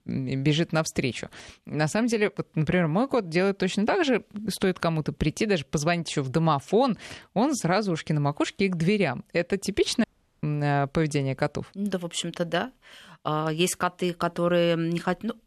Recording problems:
audio cutting out; at 10 s

